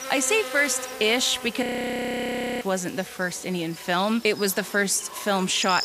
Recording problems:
echo of what is said; faint; throughout; 540 ms later, 20 dB below the speech
electrical hum; noticeable; throughout; 50 Hz, 15 dB below the speech
audio freezing; at 1.5 s for 1 s

